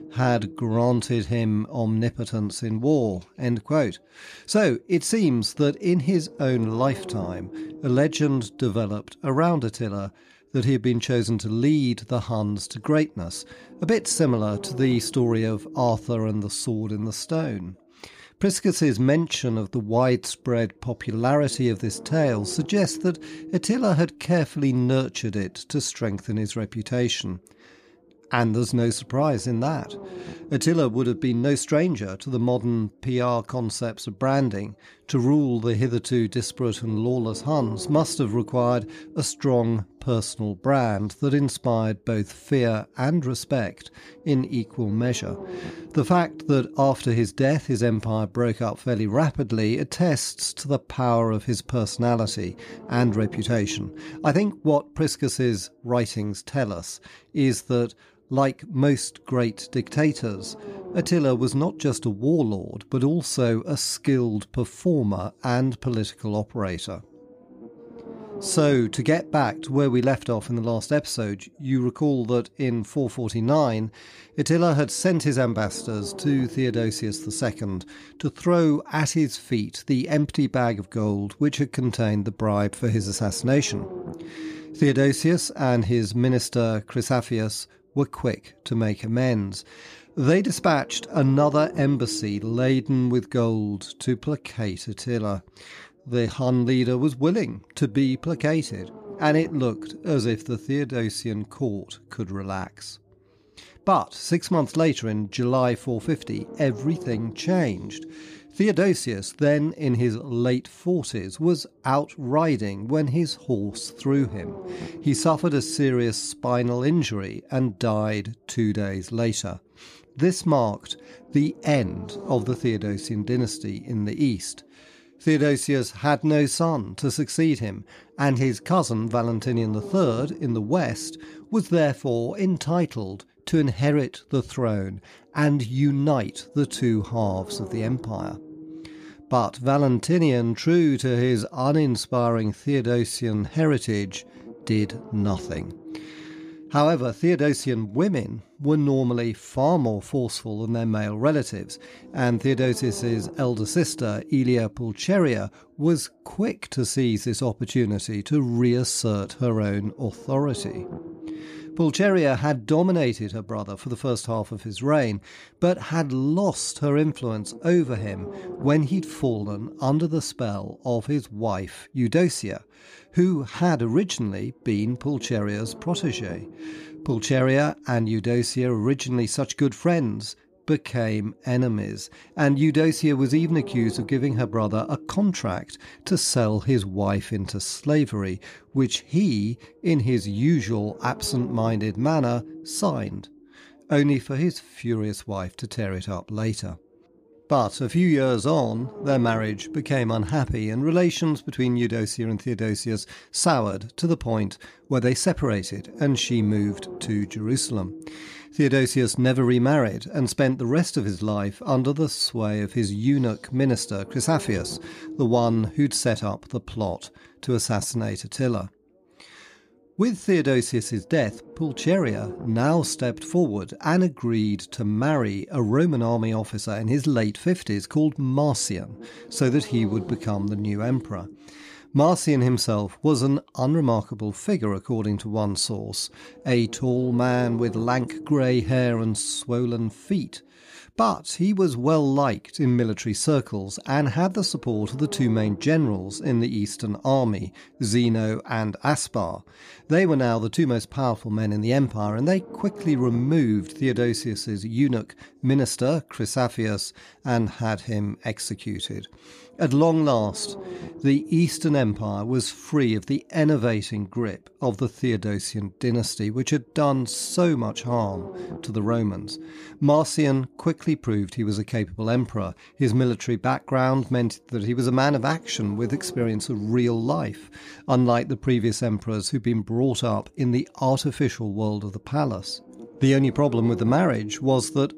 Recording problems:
low rumble; noticeable; throughout; 15 dB below the speech

